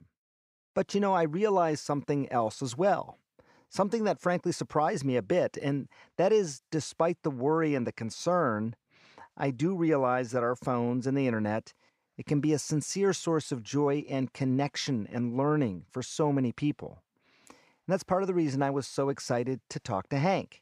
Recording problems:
none

